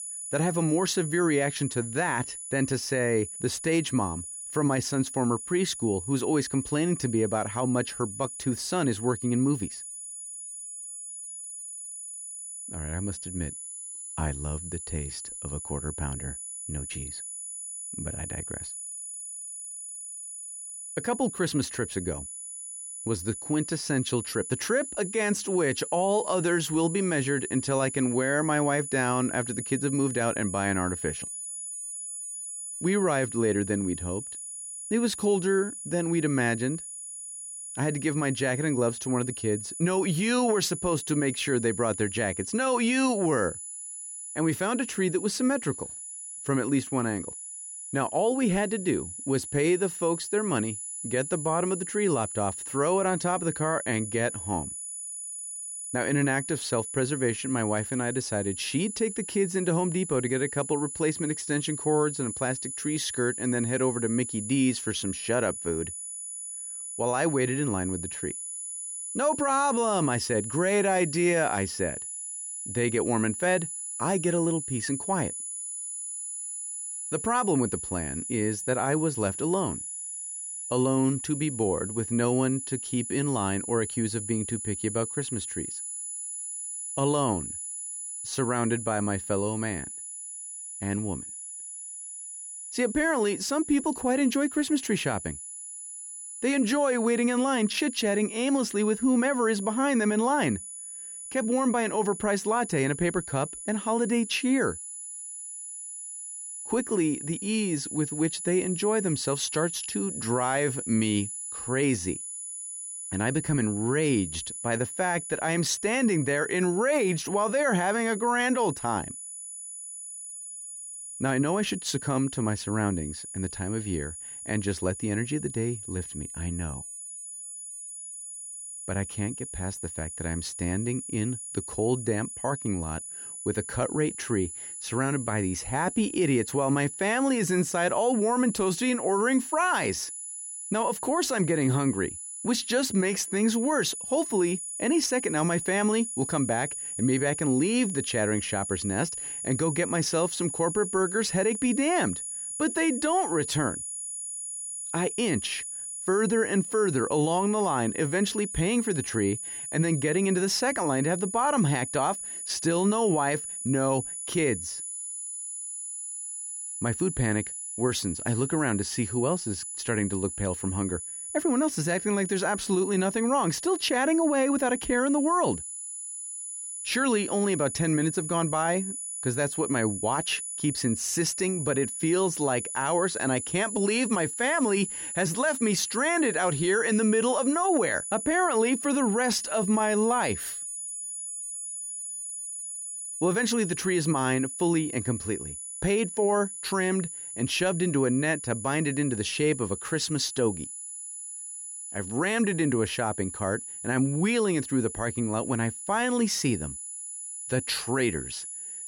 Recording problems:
high-pitched whine; loud; throughout; 10 kHz, 7 dB below the speech

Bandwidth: 16 kHz